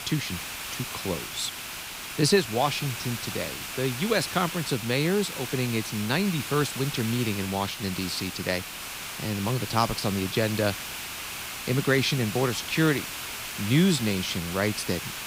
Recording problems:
hiss; loud; throughout; 6 dB below the speech

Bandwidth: 15.5 kHz